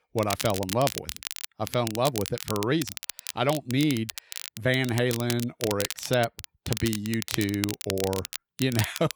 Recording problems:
crackle, like an old record; loud; 7 dB below the speech

